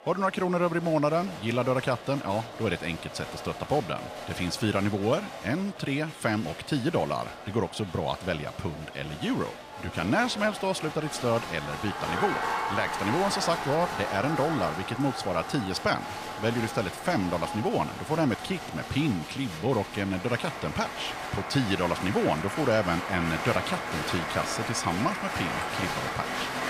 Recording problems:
crowd noise; loud; throughout; 6 dB below the speech

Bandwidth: 14.5 kHz